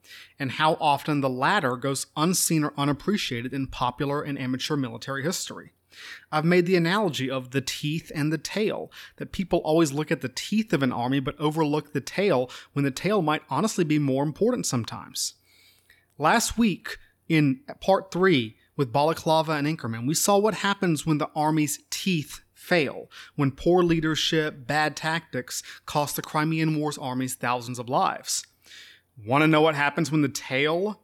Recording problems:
none

